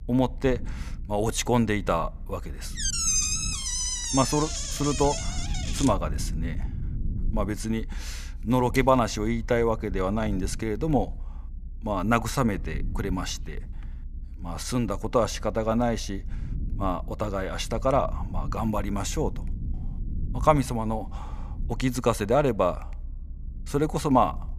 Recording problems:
low rumble; faint; throughout; 25 dB below the speech
door banging; loud; from 3 to 6 s; peak 5 dB above the speech

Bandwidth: 14.5 kHz